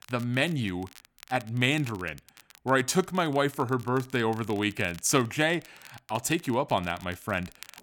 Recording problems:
crackle, like an old record; faint; 25 dB below the speech

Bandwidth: 17.5 kHz